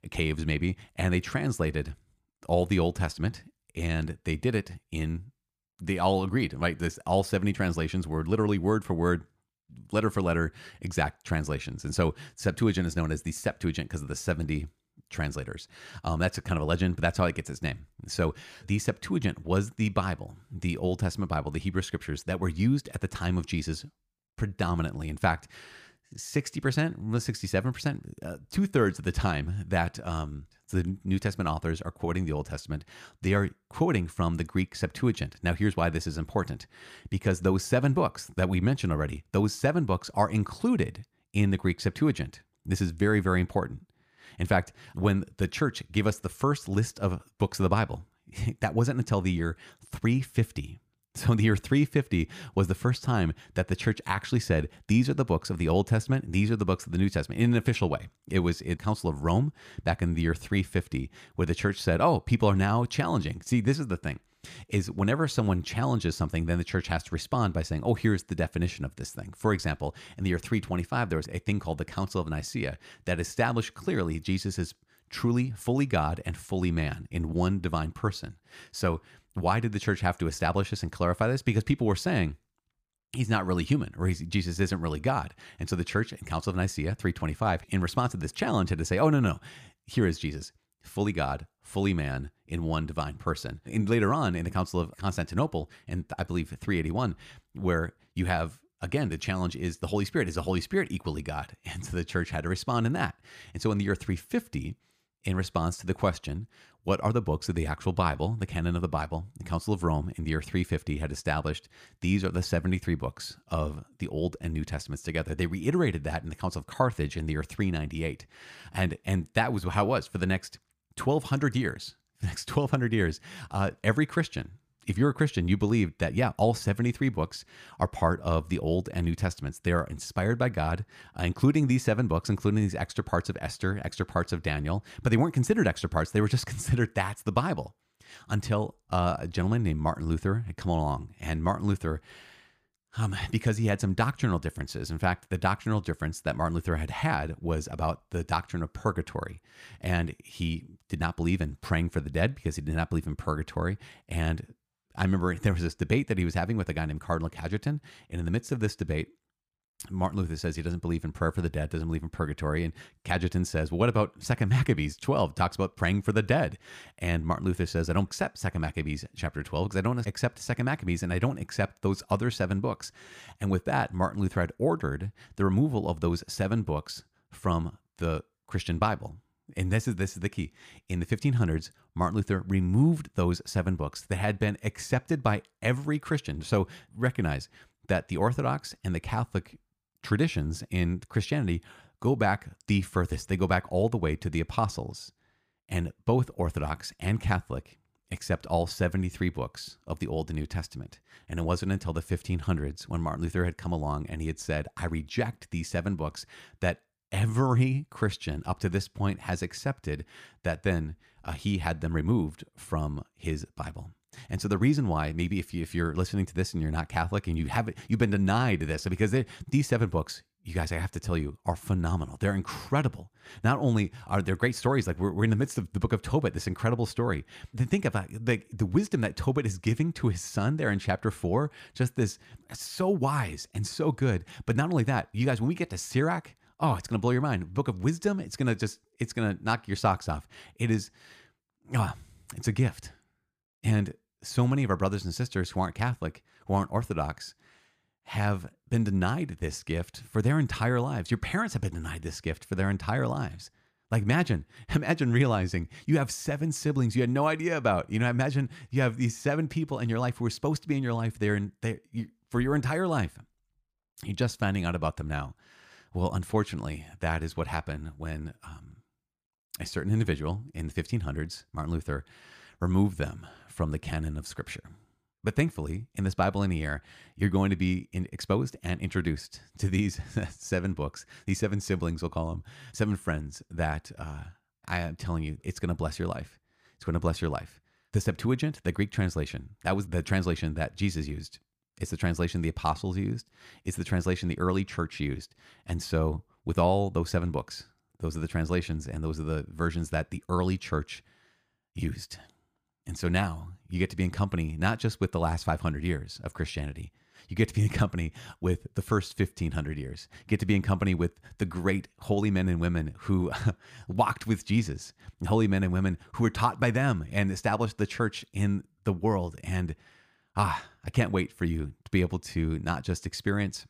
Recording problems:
none

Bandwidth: 15 kHz